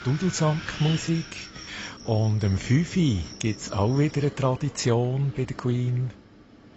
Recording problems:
garbled, watery; badly; nothing above 7.5 kHz
animal sounds; noticeable; until 5 s; 20 dB below the speech
wind noise on the microphone; occasional gusts; 10 dB below the speech

